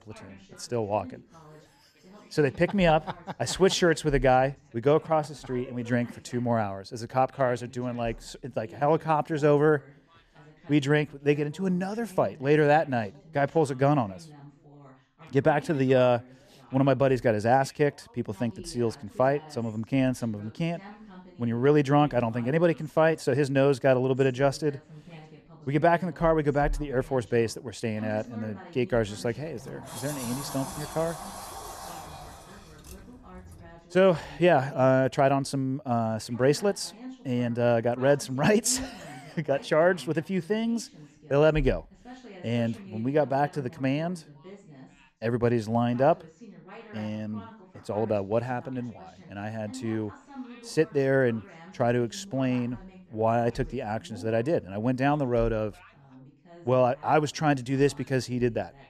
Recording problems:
background chatter; faint; throughout; 2 voices, 20 dB below the speech
door banging; noticeable; from 29 to 34 s; peak 10 dB below the speech

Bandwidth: 14 kHz